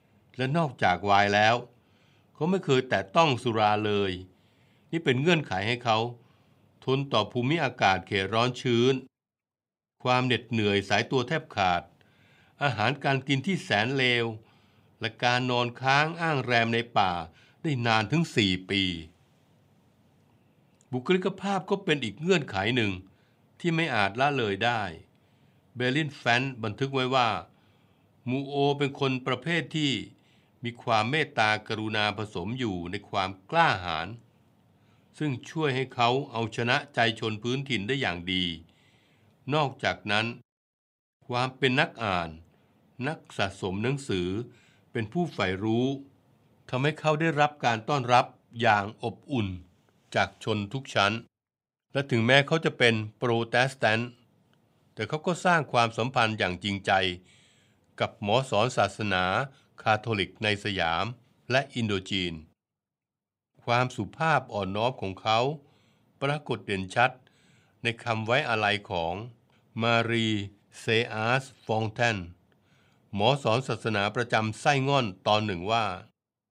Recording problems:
none

